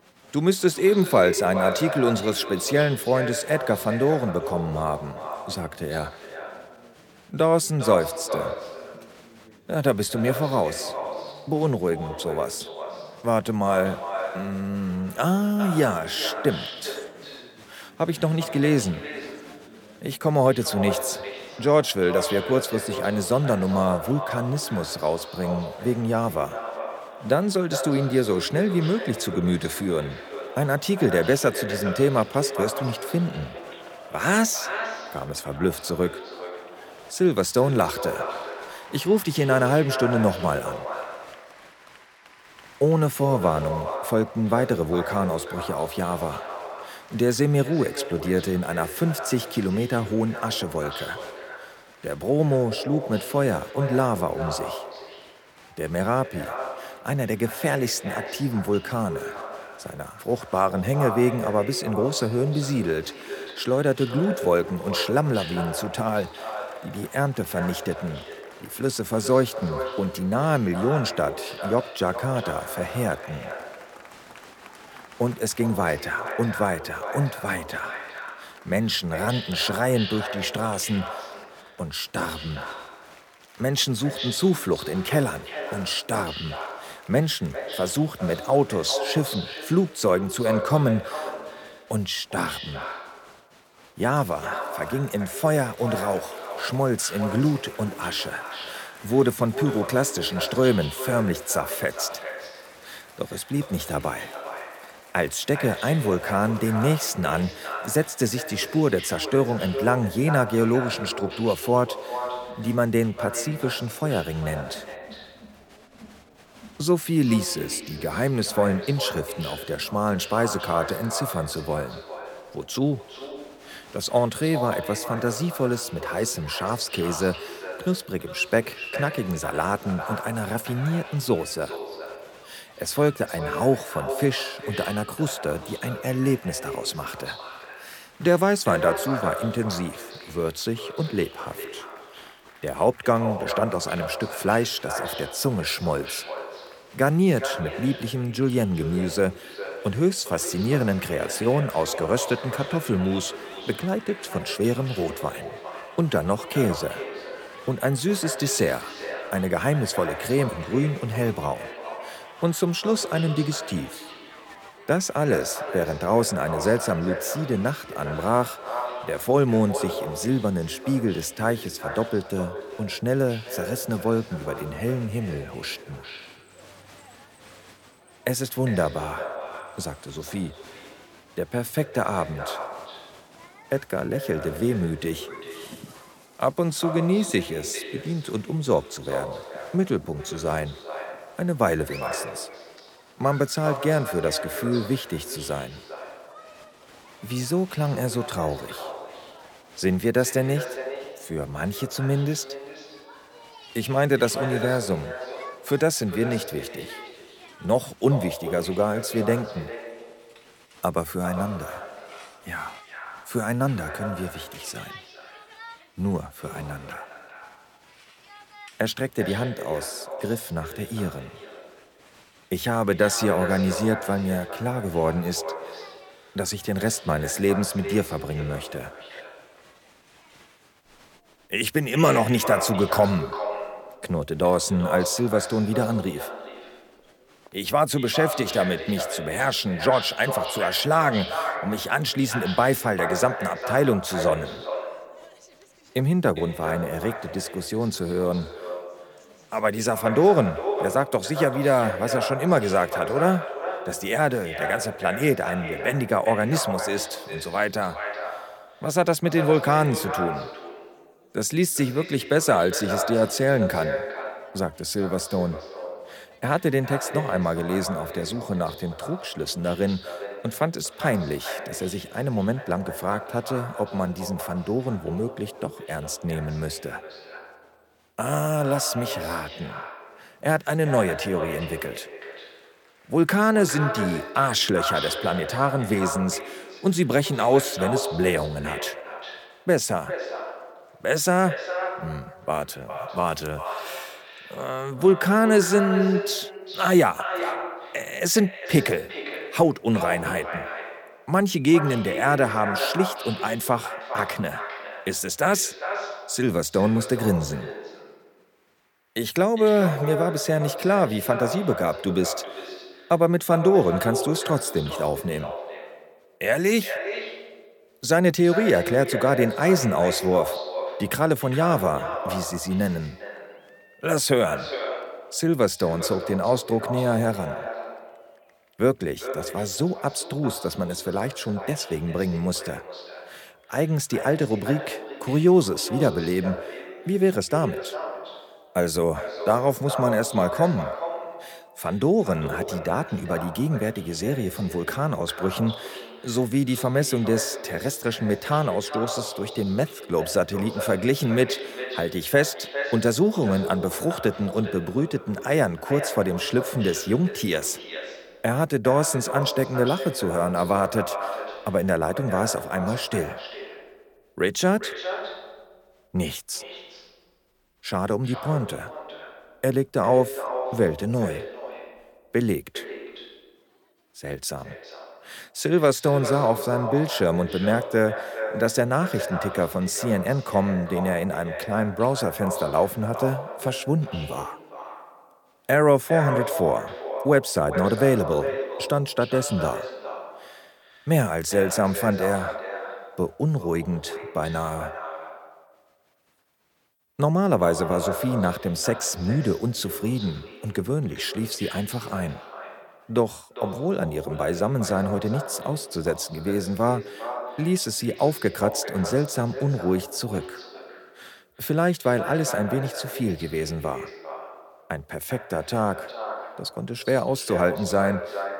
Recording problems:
echo of what is said; strong; throughout; 400 ms later, 9 dB below the speech
crowd noise; faint; throughout; 25 dB below the speech

